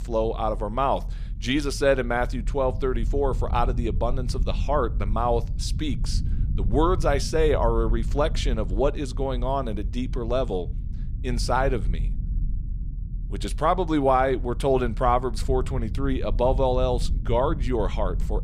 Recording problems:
low rumble; faint; throughout; 20 dB below the speech

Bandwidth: 14.5 kHz